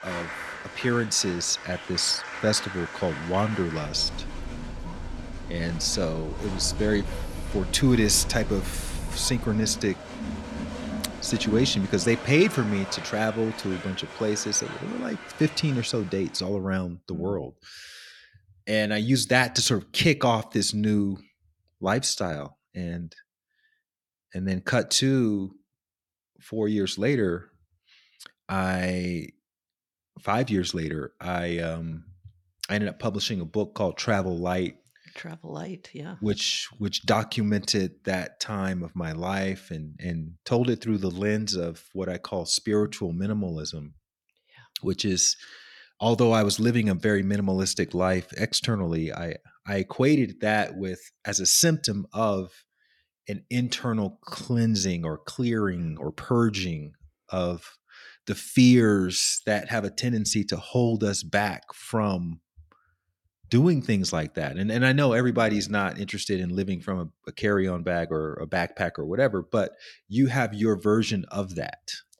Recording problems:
crowd noise; noticeable; until 16 s; 10 dB below the speech

